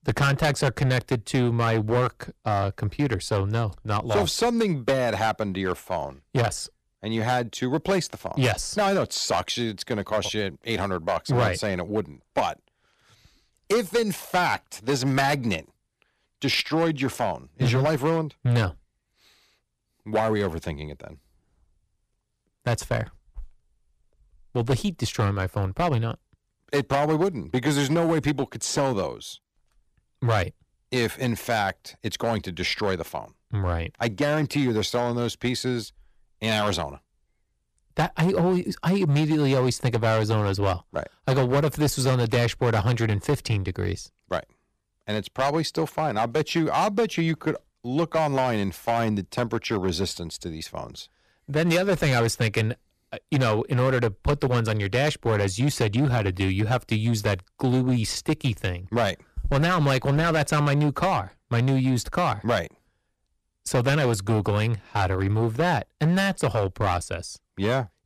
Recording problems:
distortion; heavy; 7% of the sound clipped

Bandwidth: 14.5 kHz